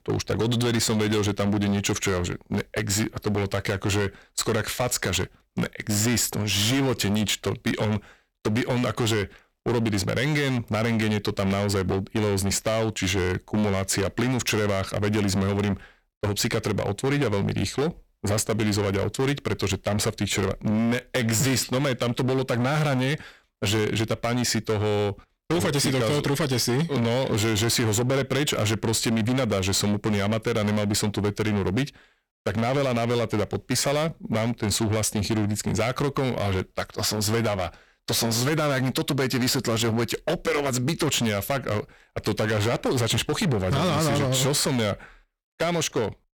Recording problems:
distortion; heavy; 20% of the sound clipped

